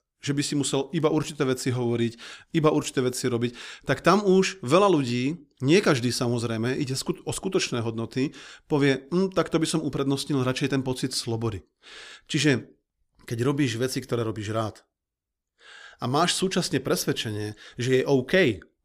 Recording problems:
none

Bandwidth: 15 kHz